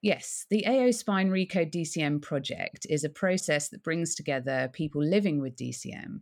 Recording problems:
none

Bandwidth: 18.5 kHz